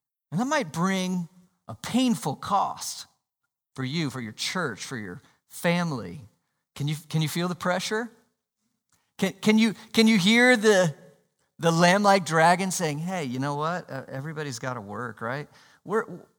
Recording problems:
none

